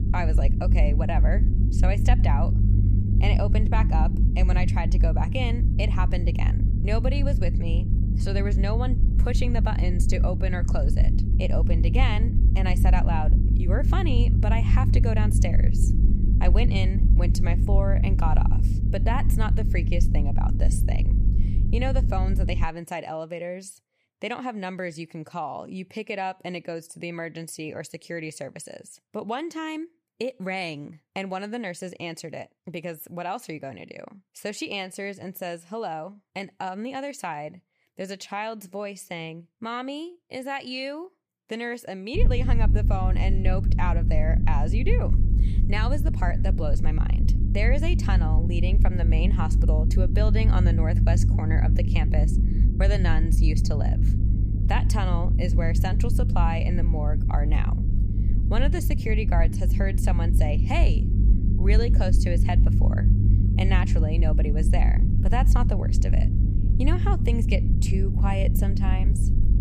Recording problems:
low rumble; loud; until 23 s and from 42 s on; 6 dB below the speech

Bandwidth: 14.5 kHz